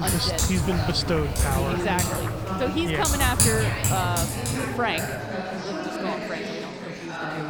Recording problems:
household noises; very loud; throughout; 1 dB above the speech
murmuring crowd; loud; throughout; 4 dB below the speech
abrupt cut into speech; at the start

